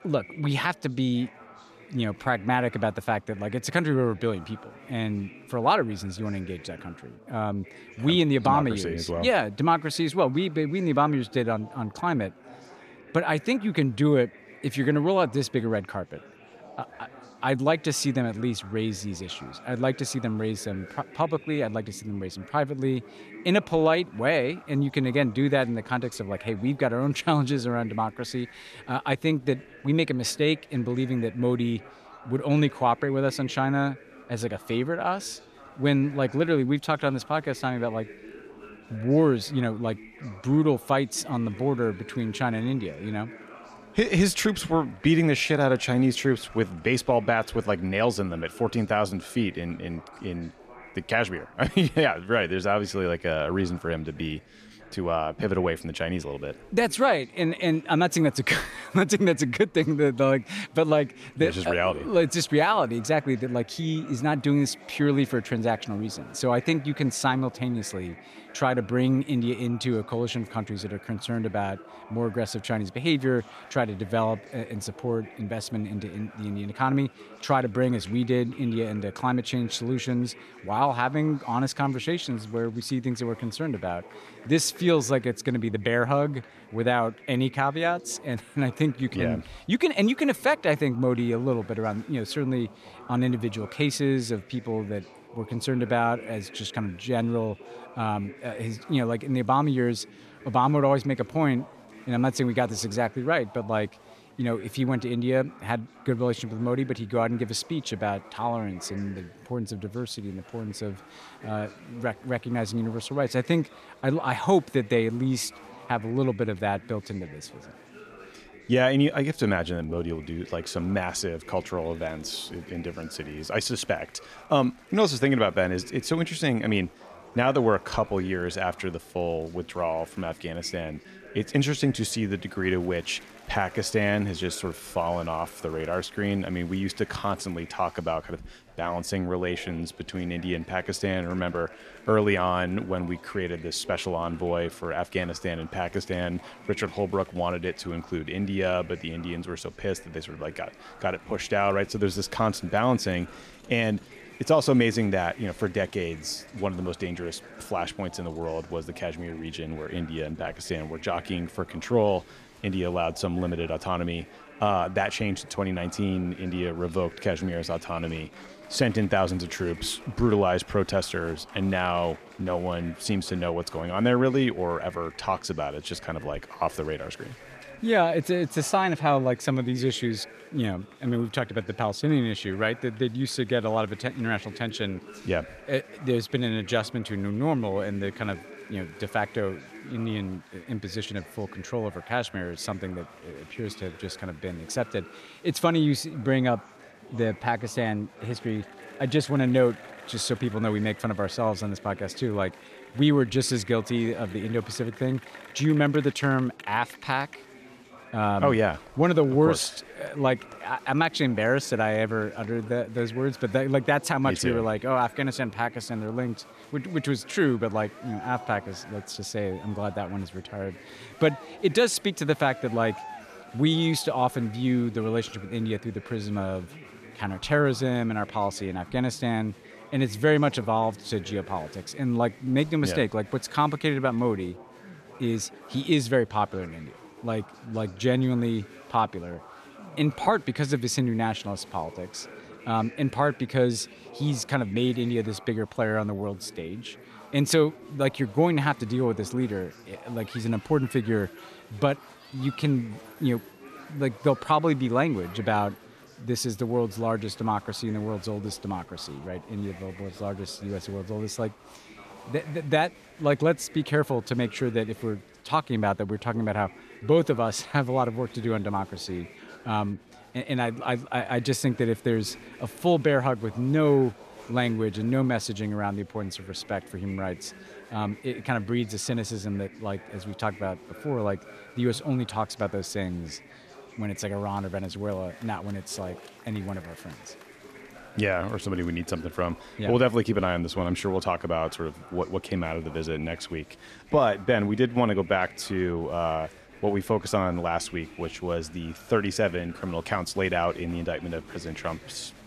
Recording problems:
chatter from many people; faint; throughout; 20 dB below the speech

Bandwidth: 14.5 kHz